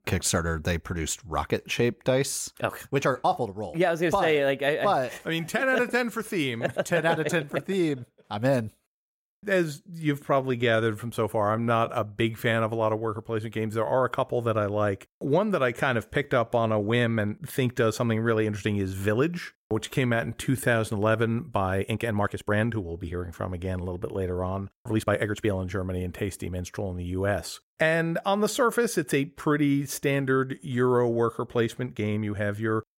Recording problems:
uneven, jittery; strongly; from 1.5 to 32 s

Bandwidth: 16 kHz